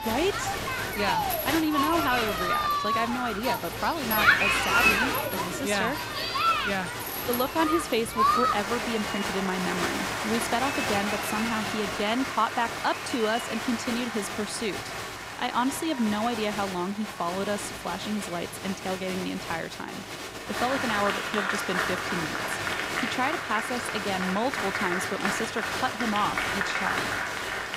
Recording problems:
crowd noise; very loud; throughout; 2 dB above the speech

